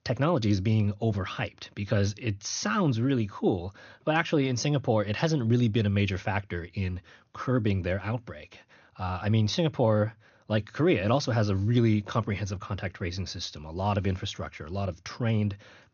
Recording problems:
high frequencies cut off; noticeable; nothing above 6.5 kHz

